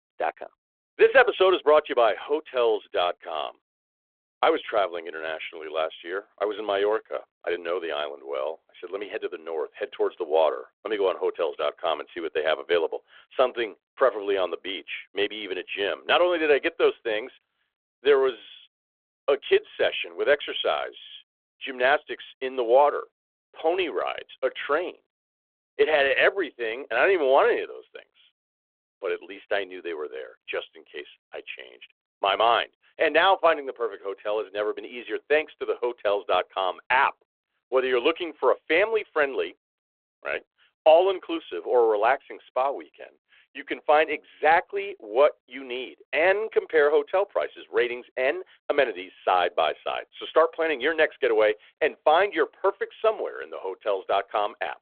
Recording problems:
phone-call audio

